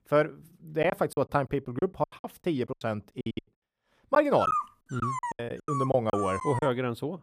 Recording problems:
choppy; very; 15% of the speech affected
dog barking; loud; from 4.5 to 6.5 s; peak level with the speech

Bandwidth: 15 kHz